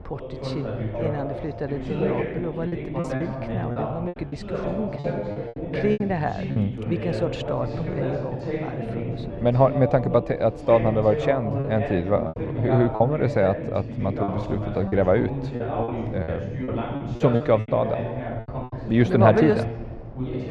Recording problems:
muffled; very; fading above 3 kHz
background chatter; loud; throughout; 2 voices, 6 dB below the speech
wind noise on the microphone; occasional gusts; 25 dB below the speech
choppy; very; from 2.5 to 6.5 s, from 12 to 13 s and from 14 to 18 s; 11% of the speech affected

